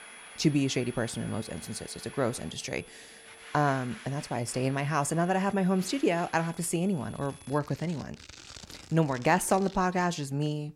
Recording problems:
household noises; noticeable; throughout; 20 dB below the speech
high-pitched whine; faint; until 7.5 s; 10.5 kHz, 20 dB below the speech

